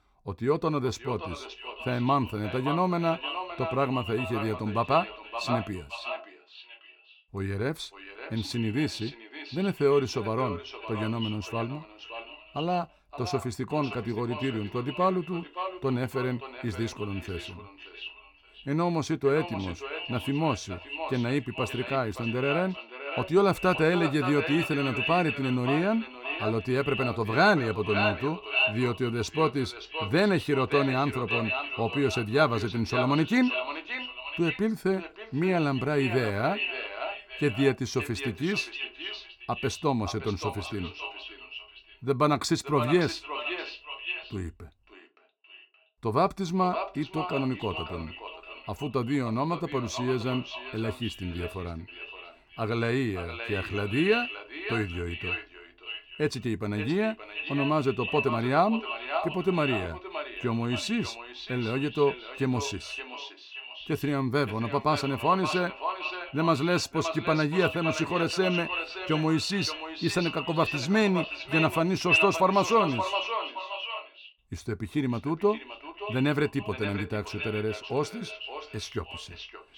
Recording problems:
echo of what is said; strong; throughout; 570 ms later, 6 dB below the speech

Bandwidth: 18.5 kHz